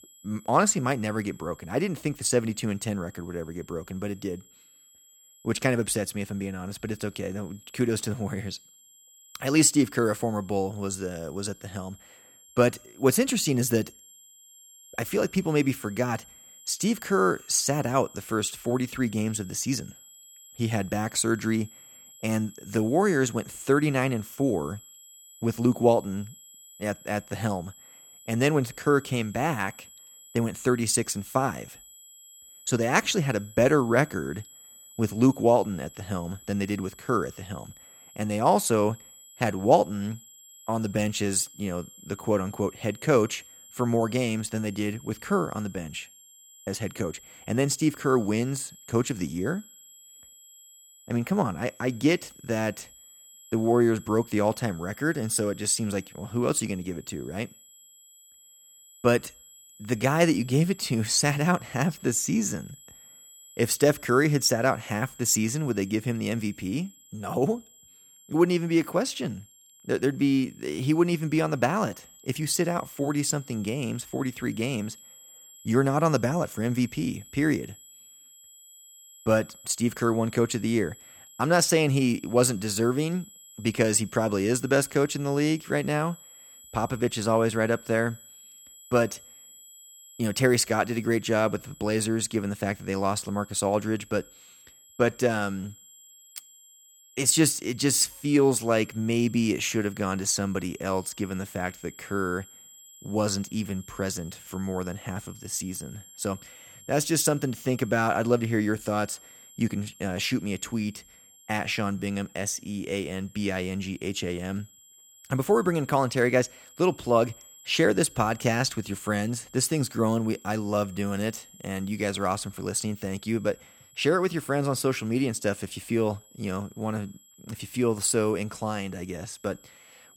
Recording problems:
high-pitched whine; faint; throughout; 7.5 kHz, 20 dB below the speech

